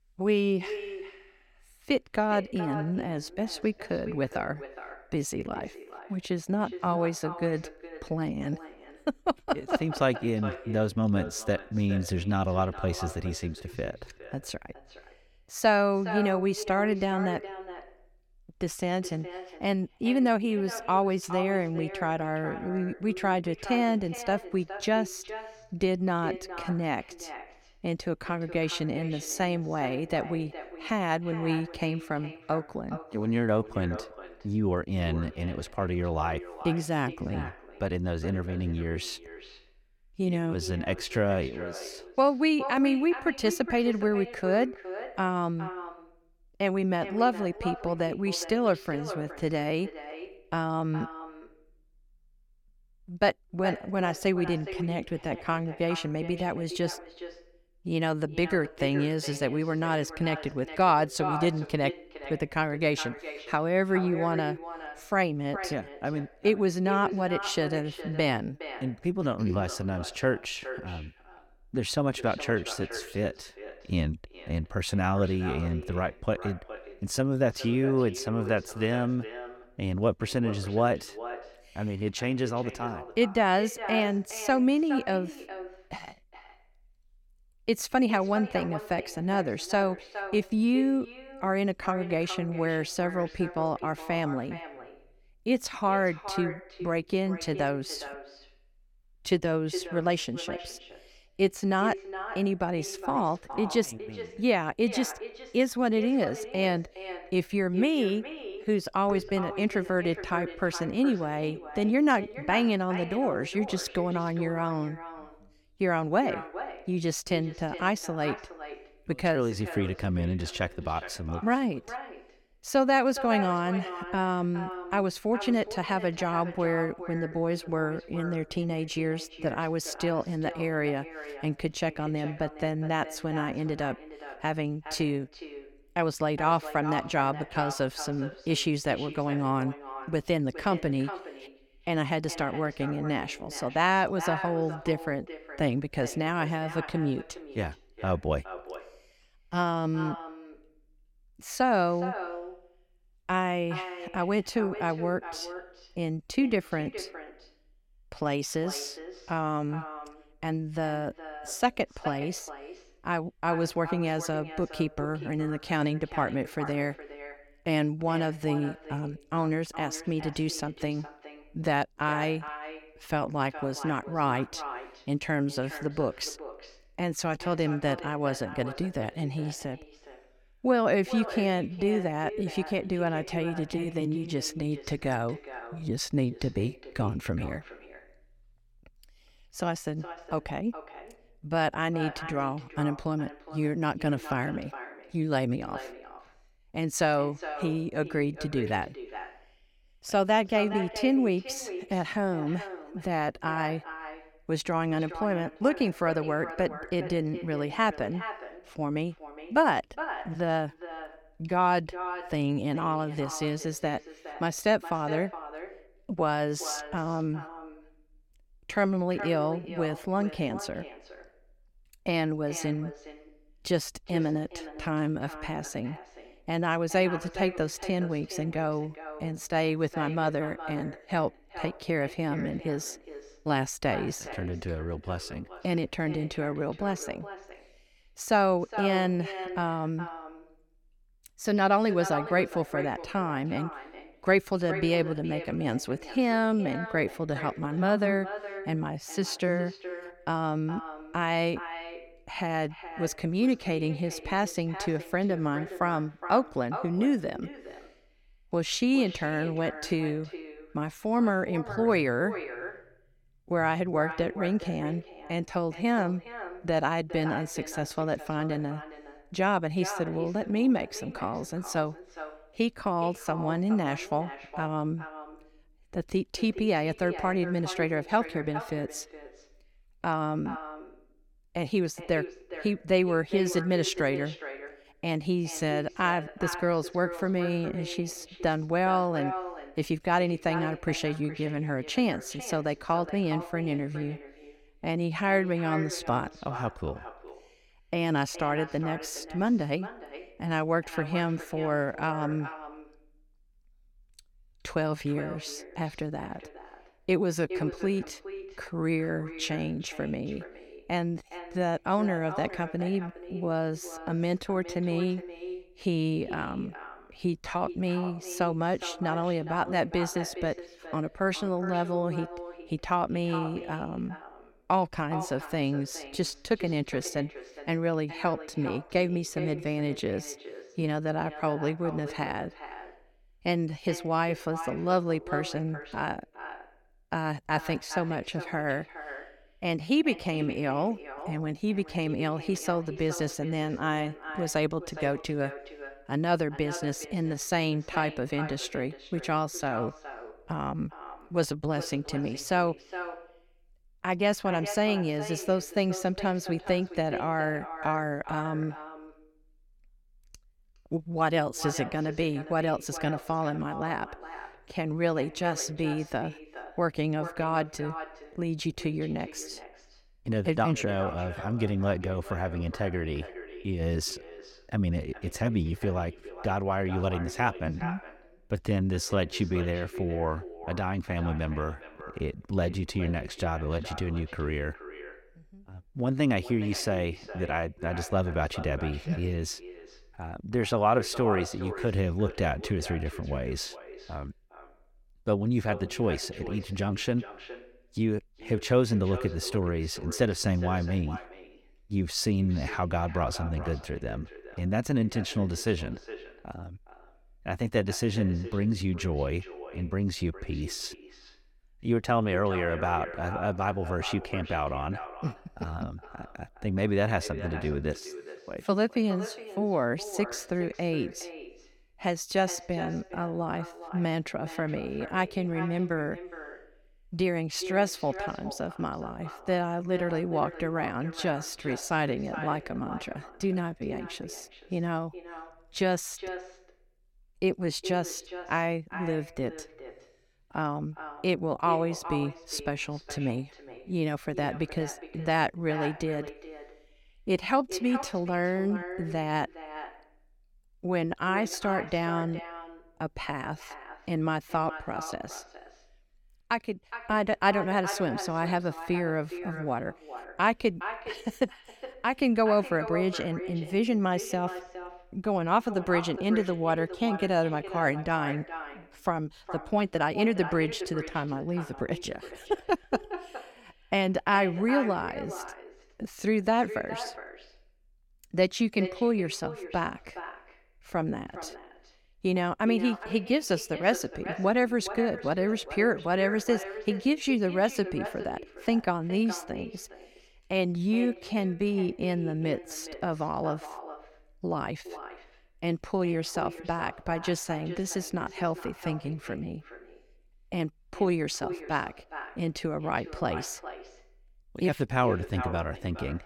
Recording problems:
echo of what is said; noticeable; throughout; 420 ms later, 10 dB below the speech
uneven, jittery; strongly; from 10 s to 7:50

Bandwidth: 17 kHz